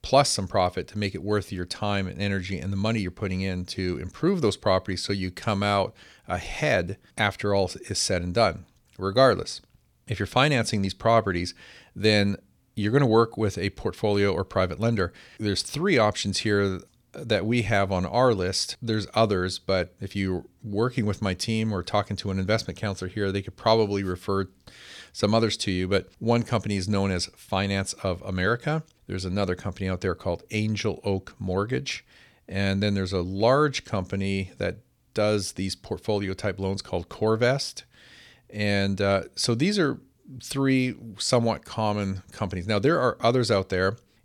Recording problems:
none

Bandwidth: 18.5 kHz